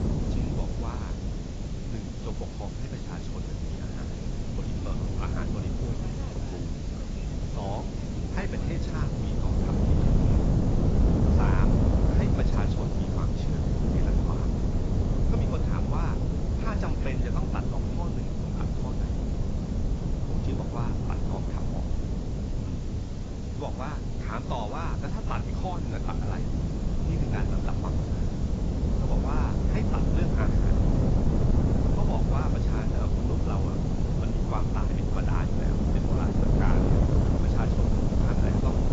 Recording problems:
garbled, watery; badly; nothing above 7.5 kHz
wind noise on the microphone; heavy; 3 dB above the speech
train or aircraft noise; noticeable; throughout; 20 dB below the speech
hiss; noticeable; throughout; 10 dB below the speech

